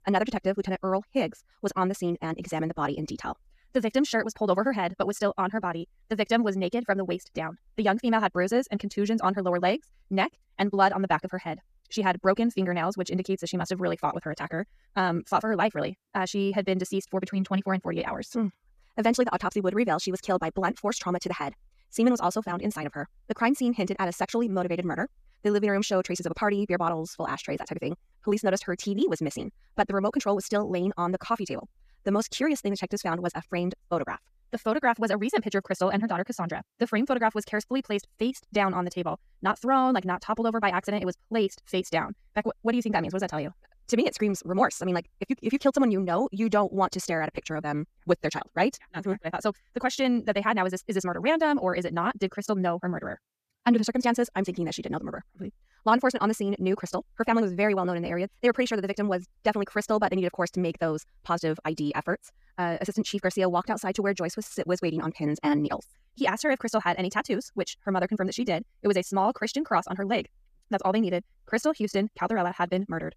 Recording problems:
wrong speed, natural pitch; too fast; 1.8 times normal speed

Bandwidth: 14.5 kHz